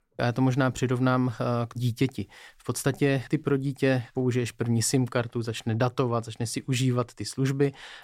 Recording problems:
none

